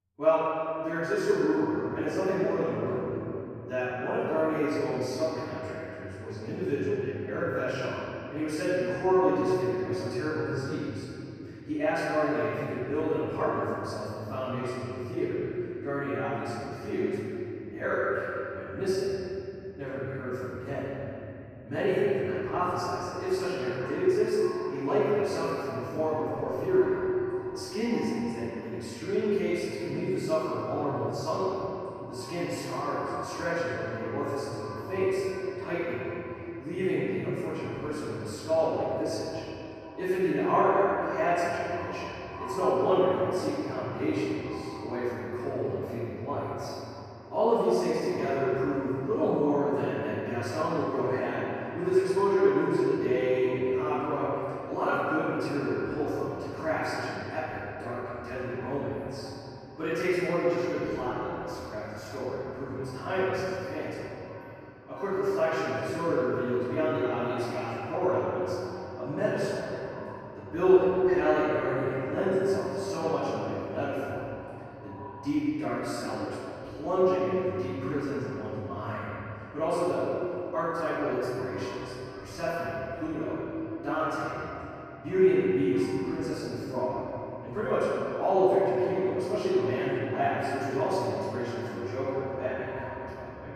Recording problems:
room echo; strong; dies away in 2.9 s
off-mic speech; far
echo of what is said; faint; from 23 s on; 600 ms later, 20 dB below the speech

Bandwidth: 14.5 kHz